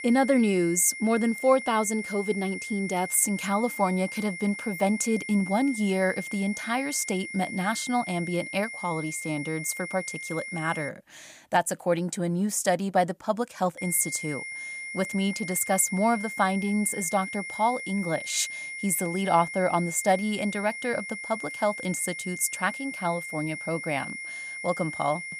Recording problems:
high-pitched whine; loud; until 11 s and from 14 s on; 2 kHz, 8 dB below the speech

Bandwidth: 15 kHz